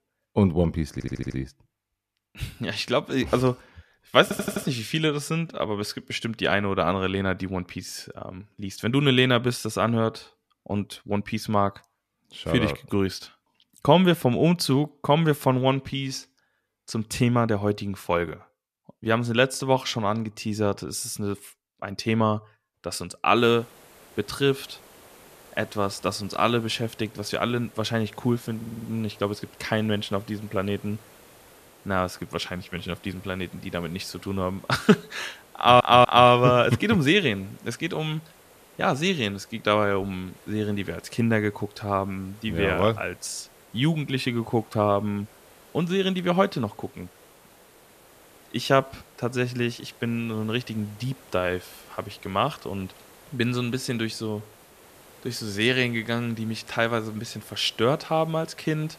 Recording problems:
hiss; faint; from 23 s on; 25 dB below the speech
audio stuttering; 4 times, first at 1 s

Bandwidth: 14.5 kHz